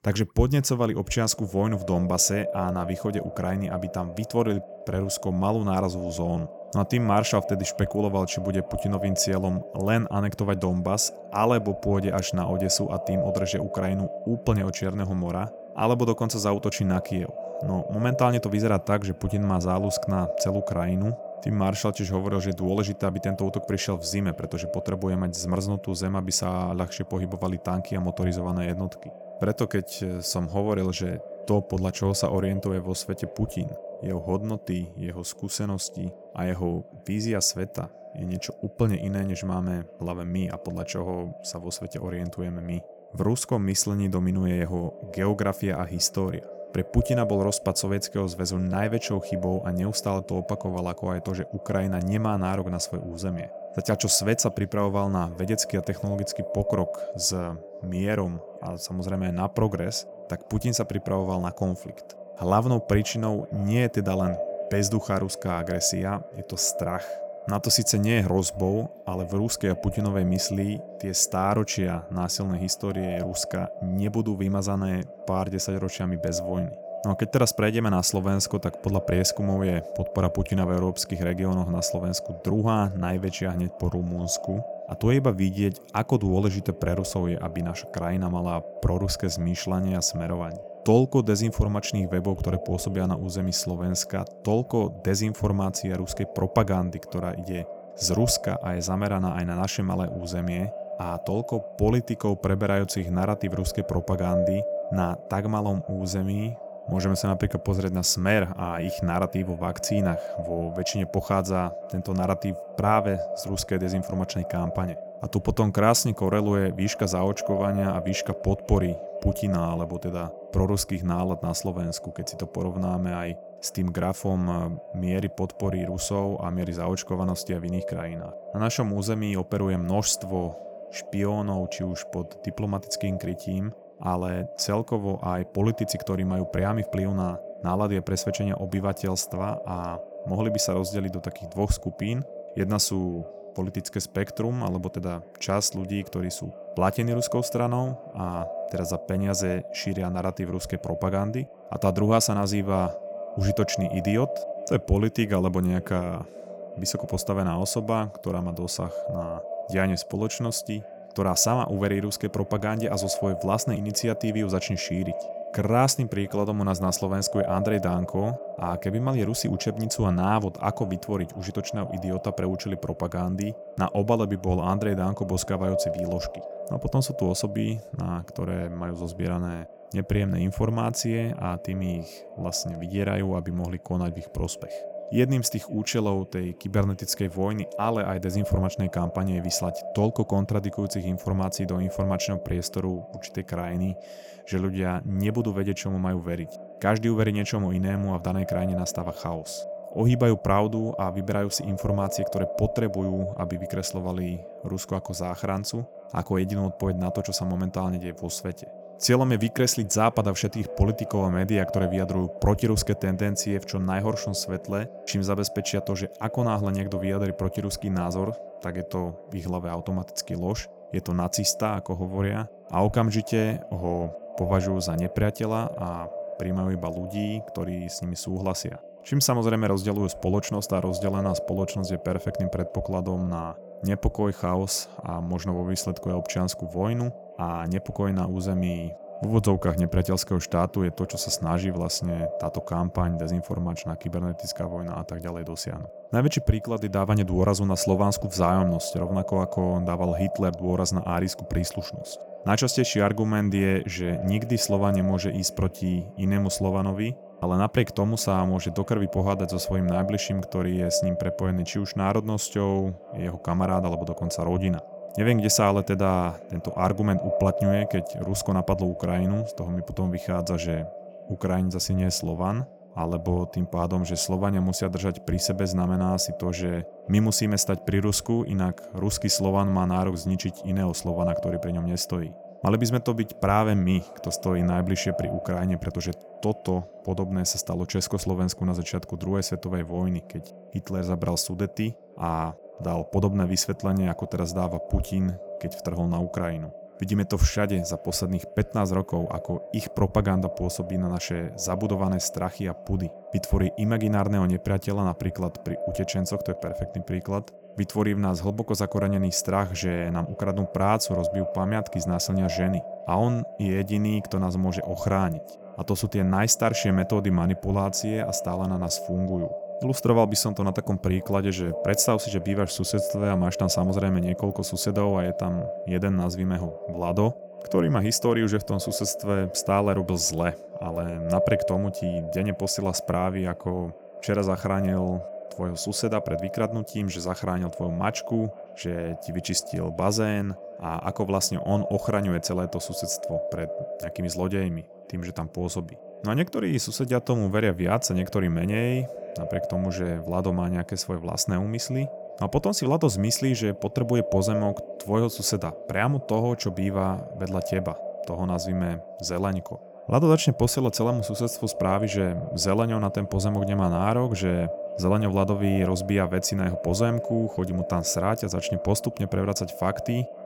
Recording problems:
echo of what is said; strong; throughout; 510 ms later, 10 dB below the speech

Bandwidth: 17 kHz